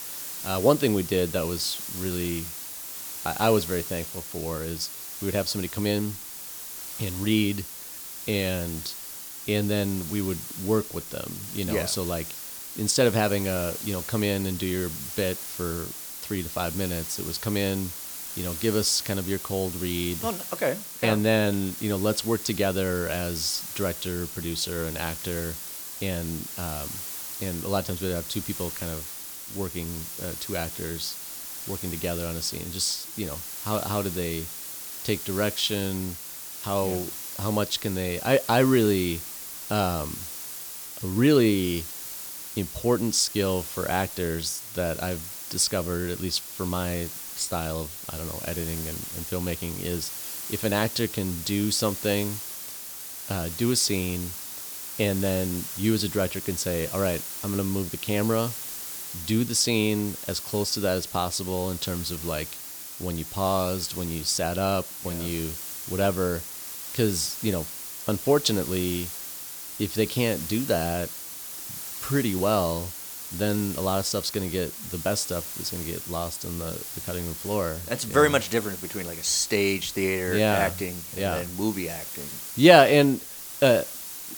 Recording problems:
hiss; loud; throughout; 7 dB below the speech

